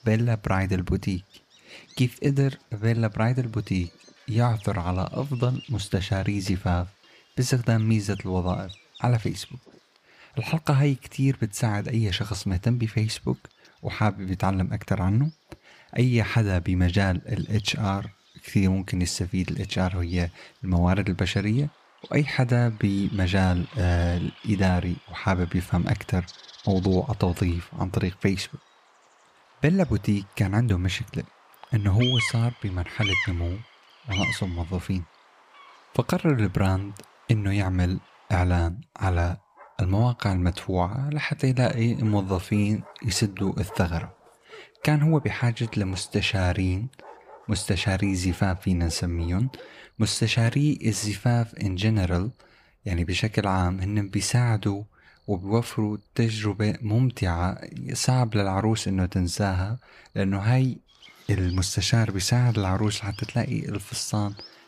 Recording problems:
animal sounds; noticeable; throughout; 15 dB below the speech

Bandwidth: 15 kHz